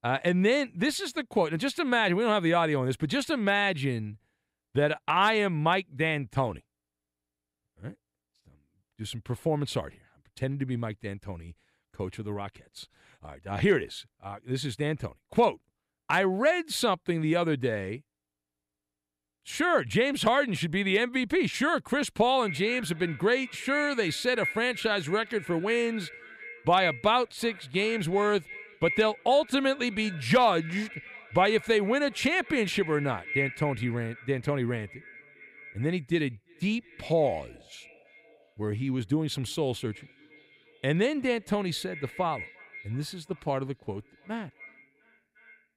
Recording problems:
echo of what is said; strong; from 22 s on; 350 ms later, 10 dB below the speech

